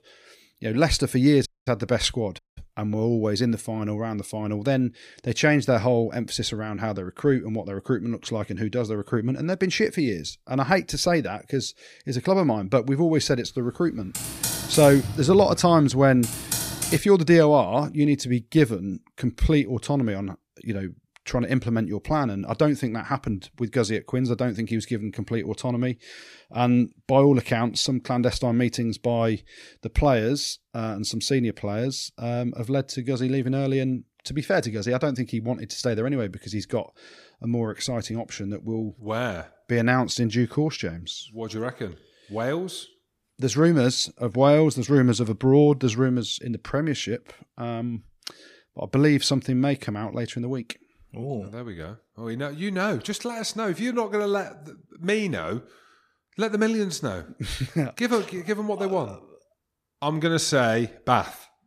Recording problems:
audio cutting out; at 1.5 s and at 2.5 s
keyboard typing; noticeable; from 14 to 17 s; peak 1 dB below the speech

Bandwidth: 14.5 kHz